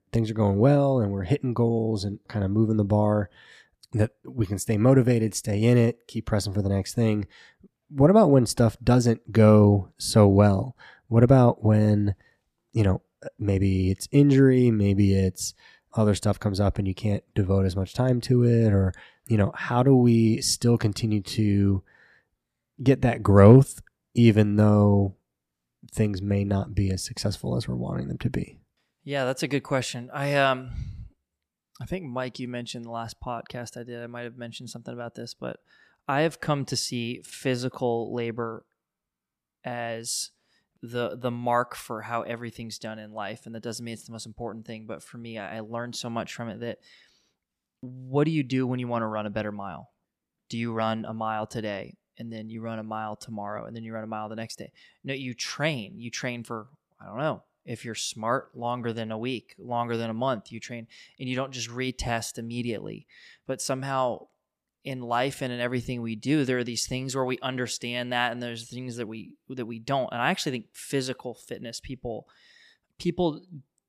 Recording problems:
none

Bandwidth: 14.5 kHz